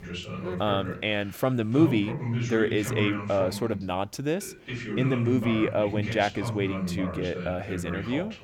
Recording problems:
voice in the background; loud; throughout; 6 dB below the speech

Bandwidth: 17.5 kHz